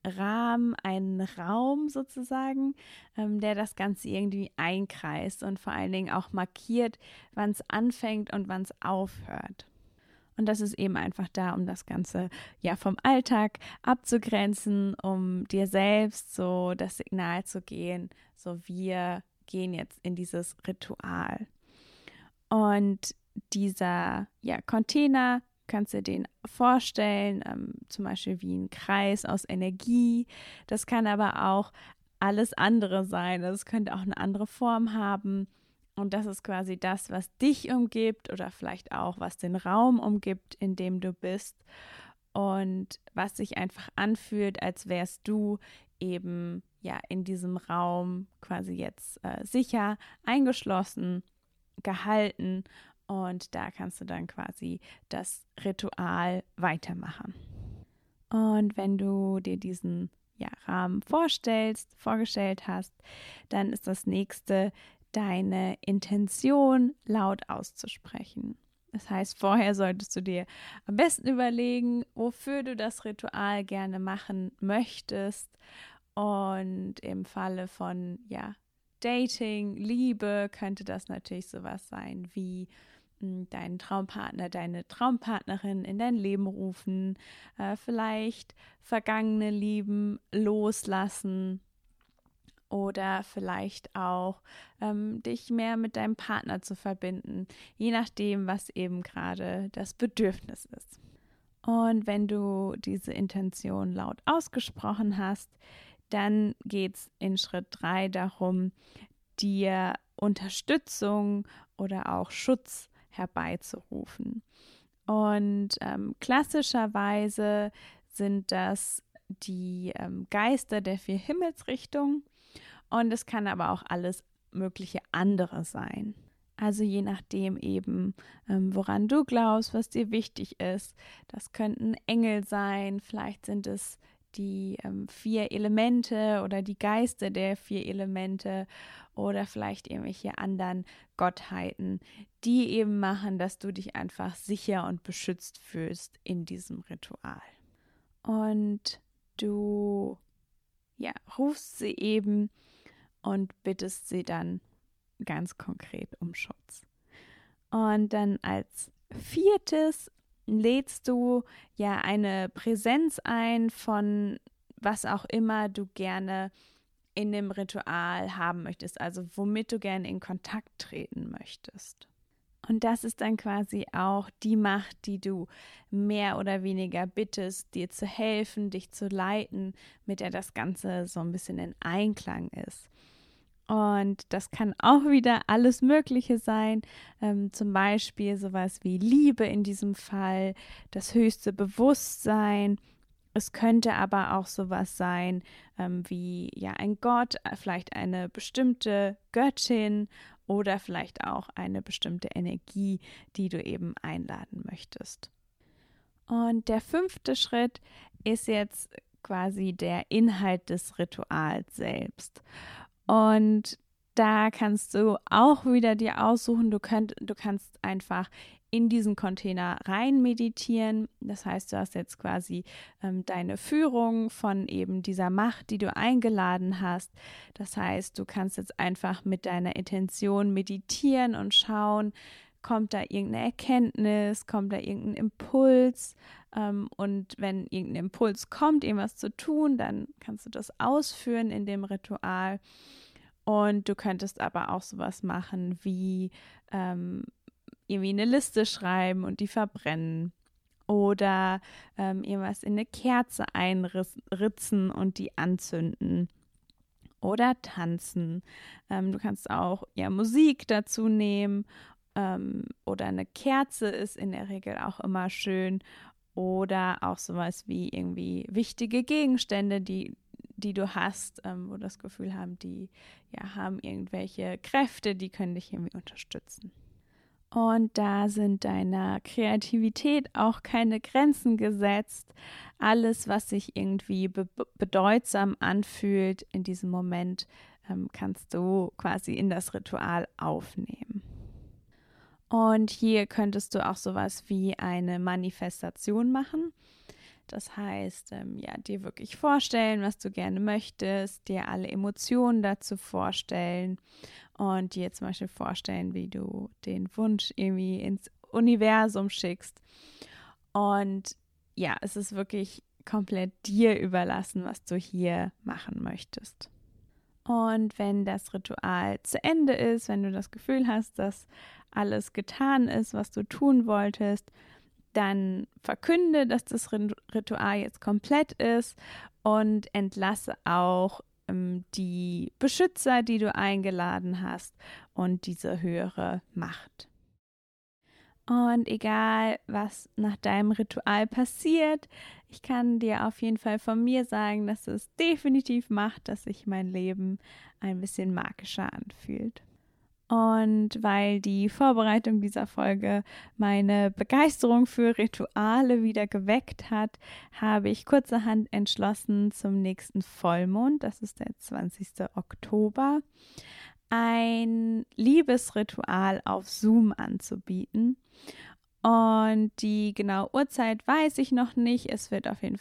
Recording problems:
none

